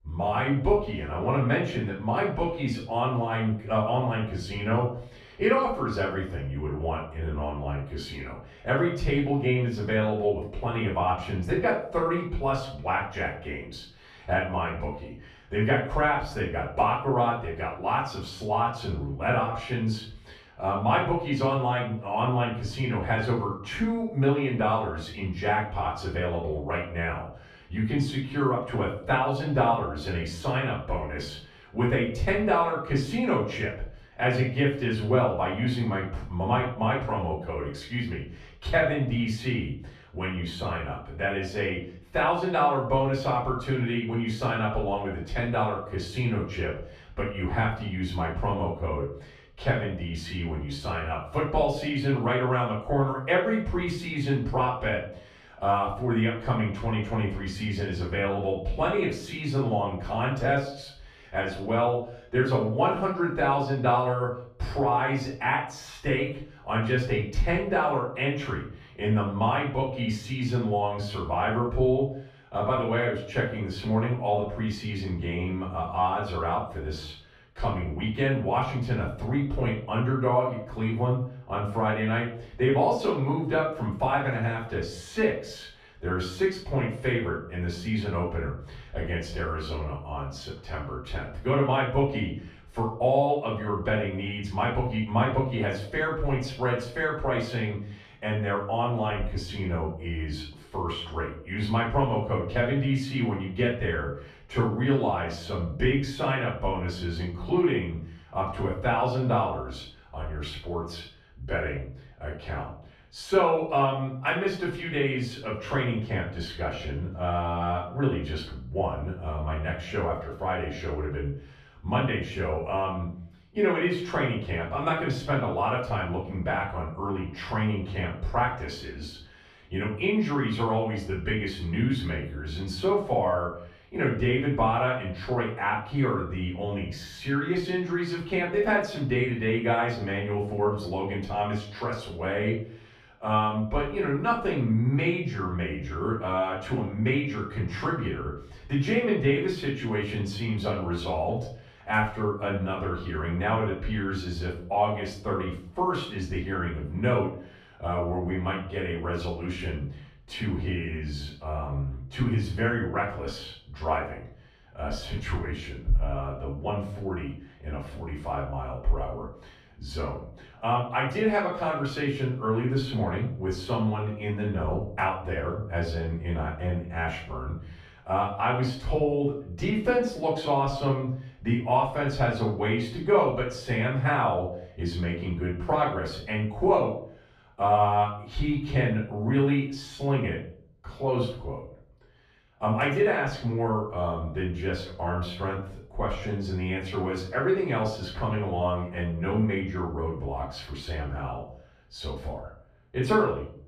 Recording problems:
off-mic speech; far
room echo; noticeable; dies away in 0.5 s

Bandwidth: 14.5 kHz